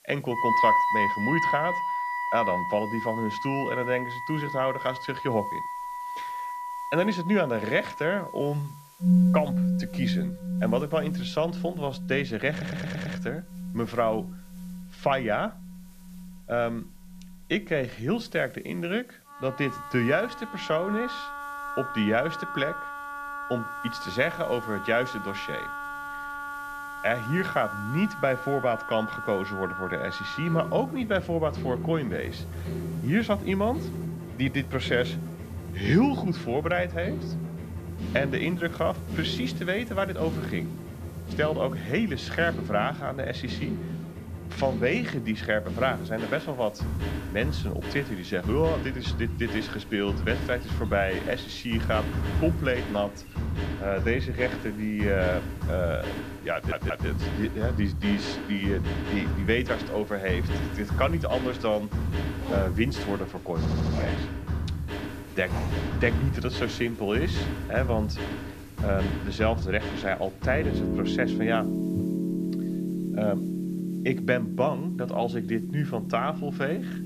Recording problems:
muffled; very slightly; fading above 3.5 kHz
background music; loud; throughout; 3 dB below the speech
household noises; noticeable; from 49 s on; 15 dB below the speech
hiss; faint; throughout; 25 dB below the speech
audio stuttering; at 13 s, at 57 s and at 1:04

